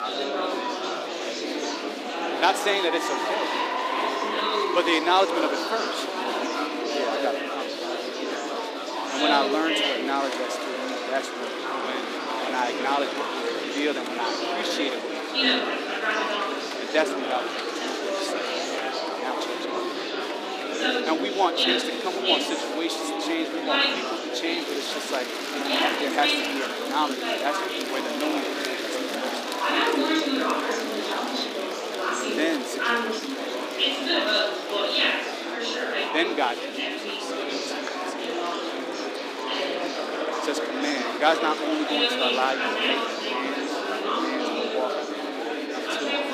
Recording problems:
thin; very slightly; fading below 300 Hz
murmuring crowd; very loud; throughout; 2 dB above the speech

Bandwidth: 15 kHz